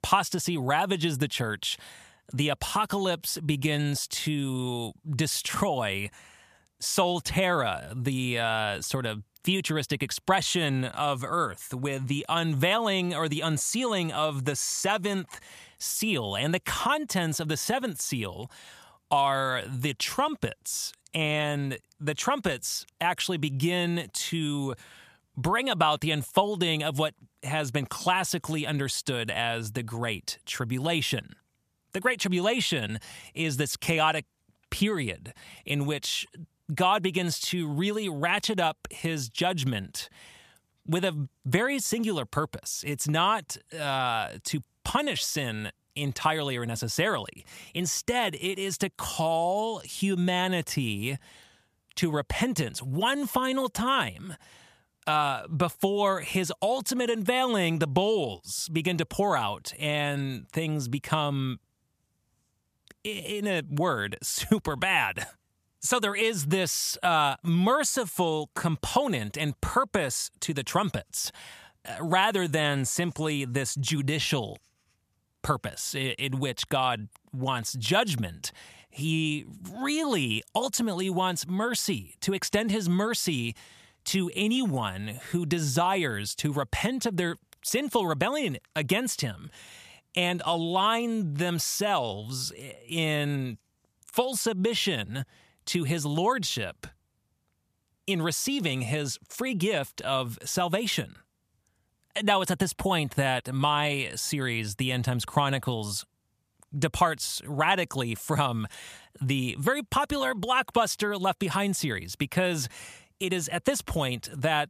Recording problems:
none

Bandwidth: 14.5 kHz